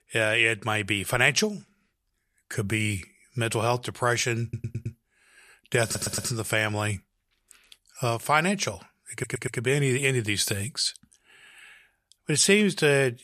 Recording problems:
audio stuttering; at 4.5 s, at 6 s and at 9 s

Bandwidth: 14.5 kHz